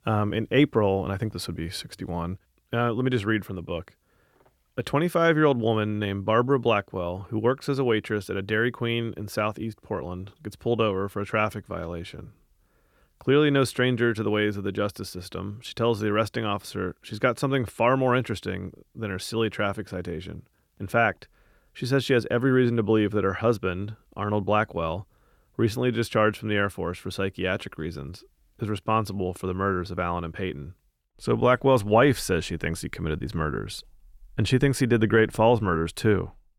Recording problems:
none

